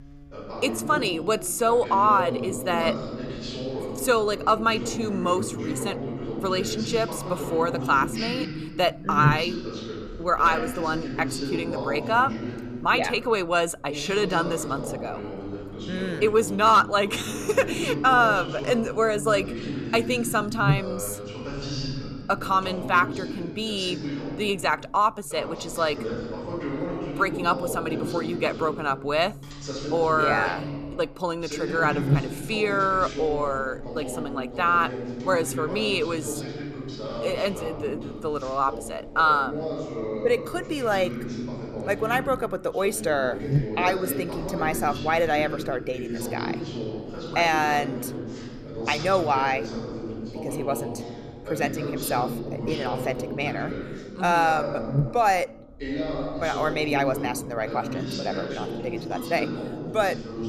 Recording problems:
voice in the background; loud; throughout; 8 dB below the speech
electrical hum; faint; throughout; 60 Hz, 20 dB below the speech

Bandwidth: 14.5 kHz